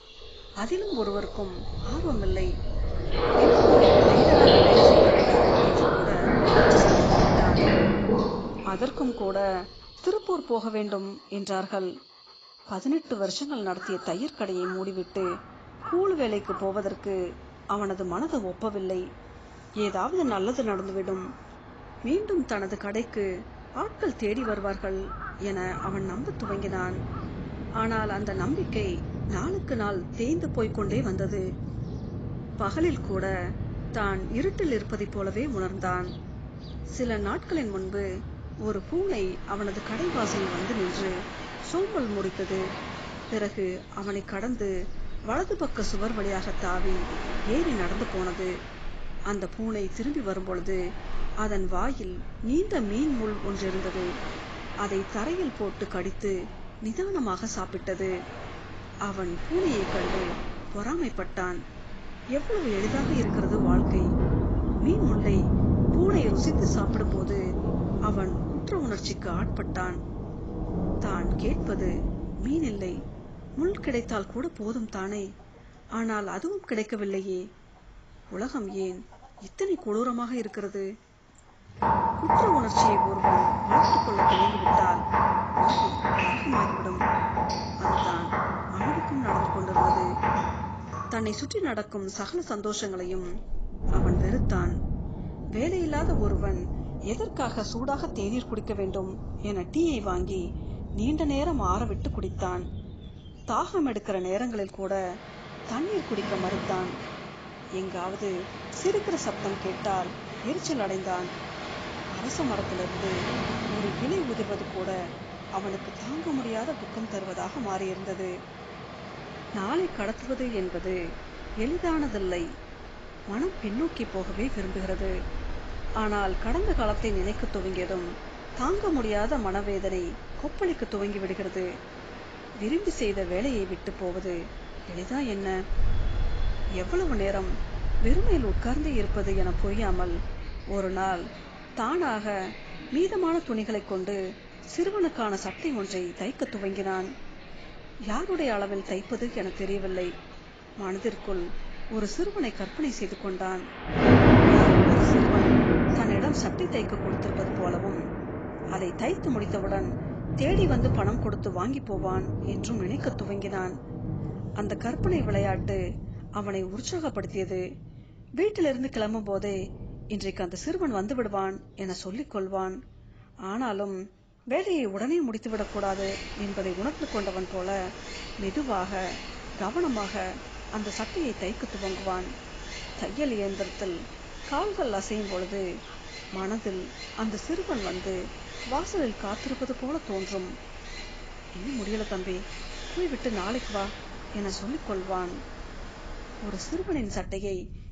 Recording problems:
garbled, watery; badly; nothing above 7.5 kHz
rain or running water; very loud; throughout; 4 dB above the speech
animal sounds; faint; throughout; 20 dB below the speech

